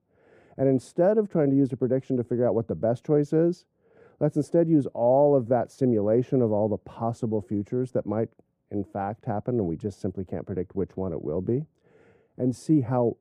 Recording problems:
muffled; very; fading above 1.5 kHz

